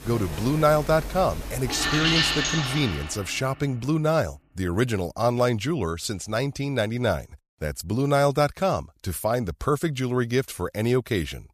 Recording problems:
household noises; loud; until 2.5 s; 2 dB below the speech

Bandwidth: 14.5 kHz